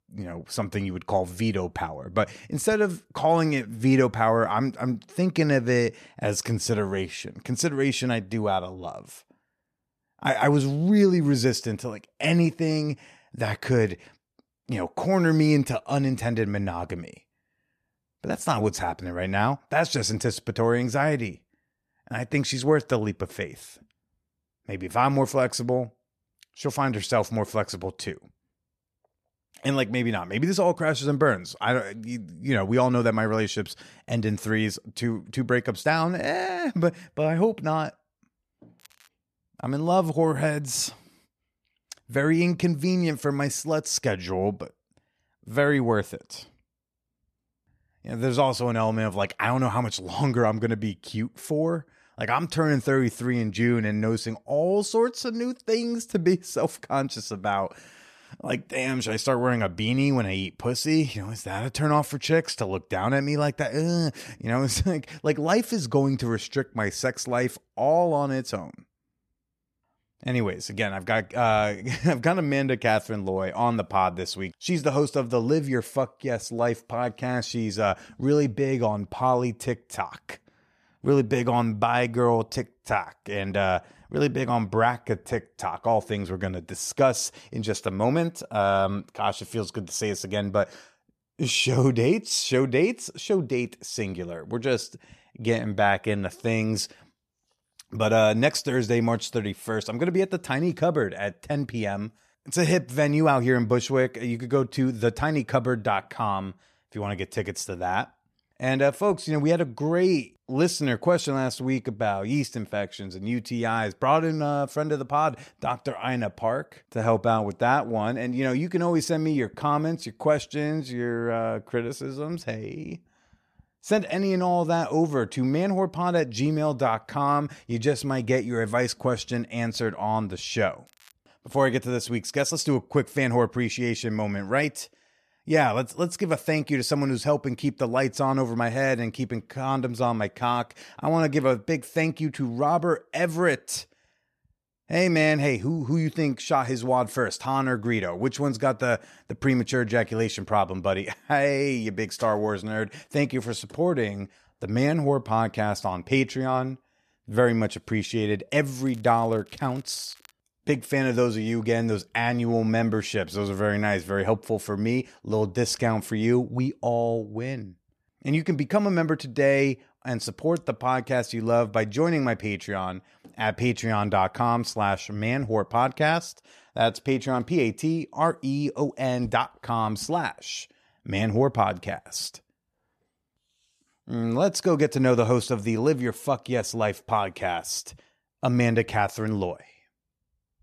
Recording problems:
crackling; faint; at 39 s, at 2:11 and from 2:39 to 2:40; 30 dB below the speech

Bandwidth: 14.5 kHz